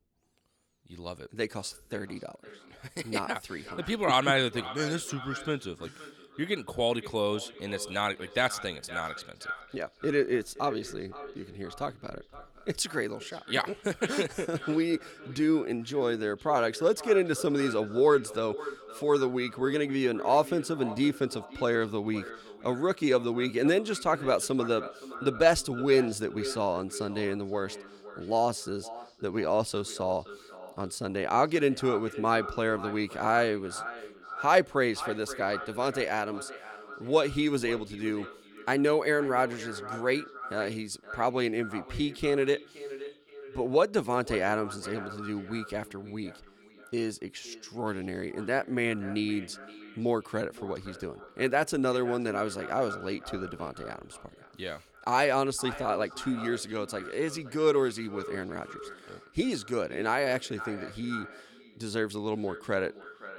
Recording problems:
echo of what is said; noticeable; throughout; 520 ms later, 15 dB below the speech

